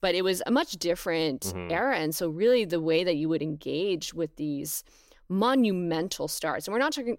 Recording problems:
none

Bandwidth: 16 kHz